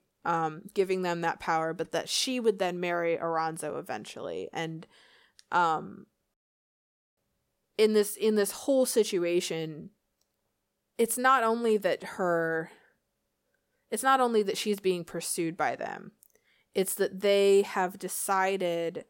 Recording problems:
none

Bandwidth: 16.5 kHz